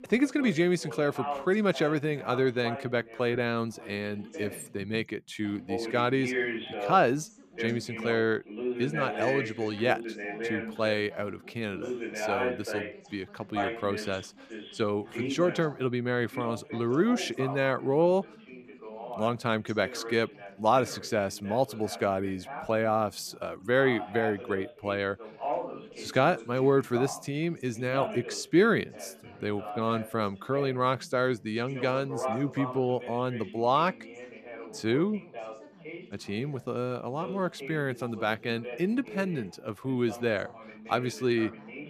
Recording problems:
background chatter; loud; throughout; 2 voices, 9 dB below the speech

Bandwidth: 14.5 kHz